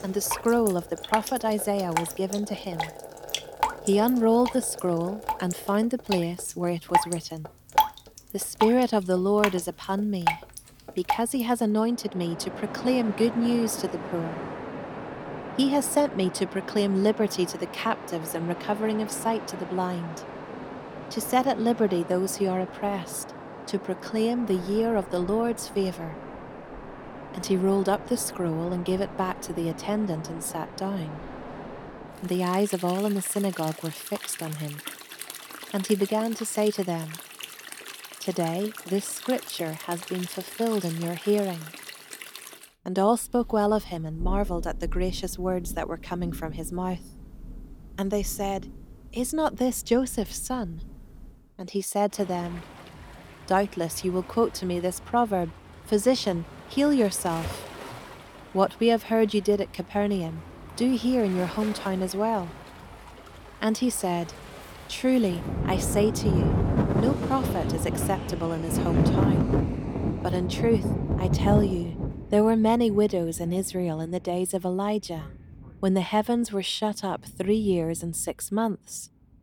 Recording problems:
rain or running water; loud; throughout; 6 dB below the speech

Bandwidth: 18.5 kHz